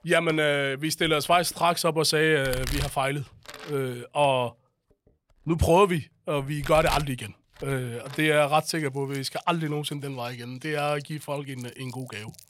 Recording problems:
household noises; noticeable; throughout; 15 dB below the speech

